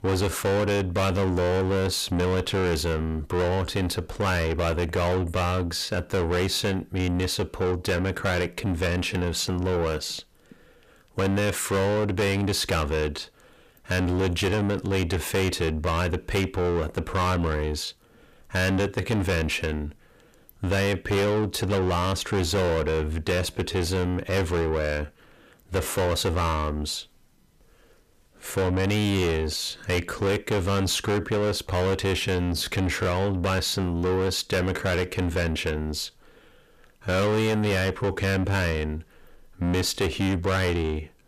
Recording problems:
distortion; heavy; 6 dB below the speech

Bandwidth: 14.5 kHz